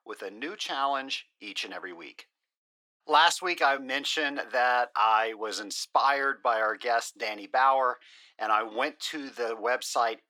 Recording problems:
thin; very; fading below 500 Hz

